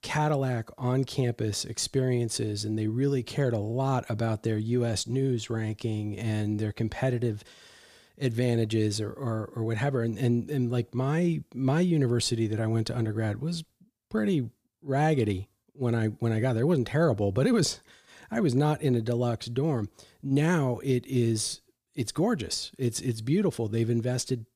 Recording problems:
none

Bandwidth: 15 kHz